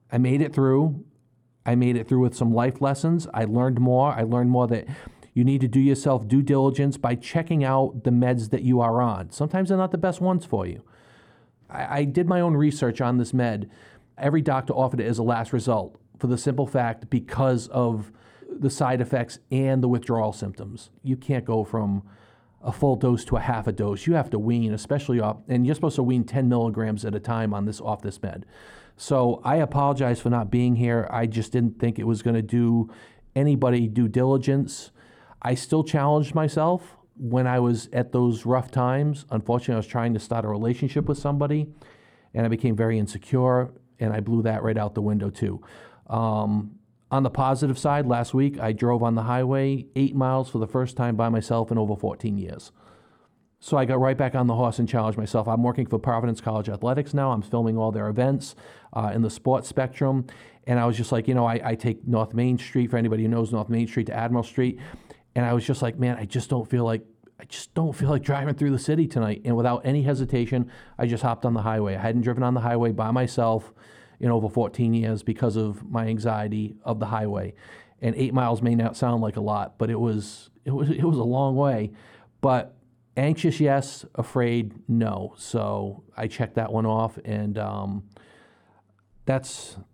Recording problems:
muffled; slightly; fading above 1.5 kHz

